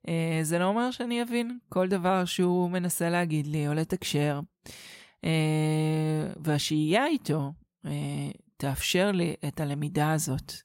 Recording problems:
none

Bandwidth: 16 kHz